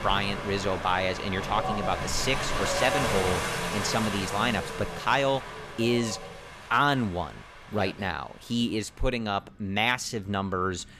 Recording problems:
wind in the background; loud; throughout; 4 dB below the speech

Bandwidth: 14.5 kHz